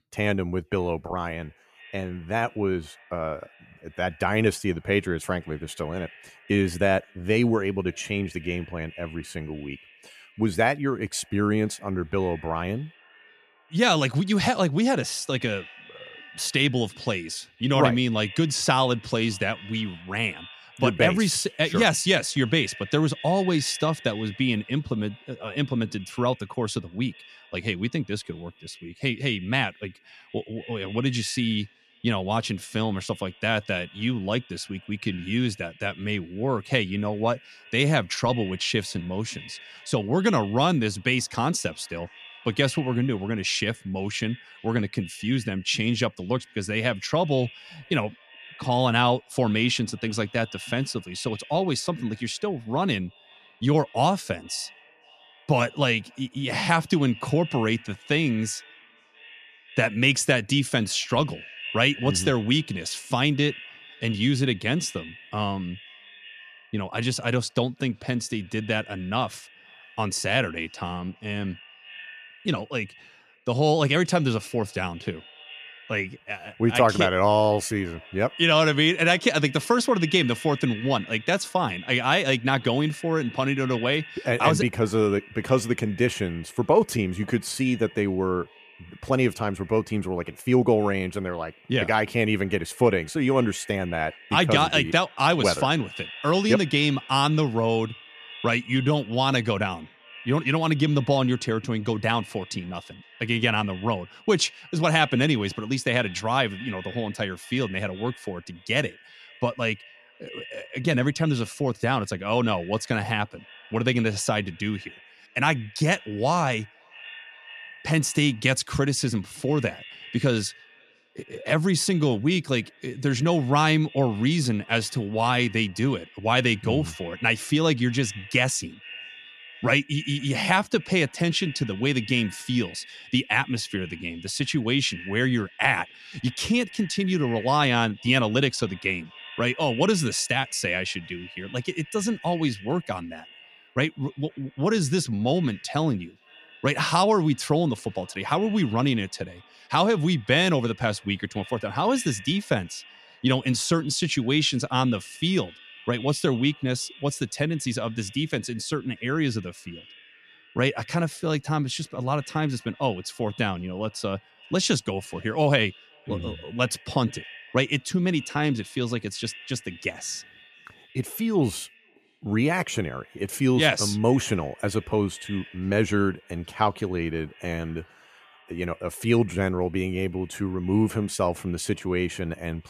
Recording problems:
echo of what is said; faint; throughout; 510 ms later, 20 dB below the speech

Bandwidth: 14.5 kHz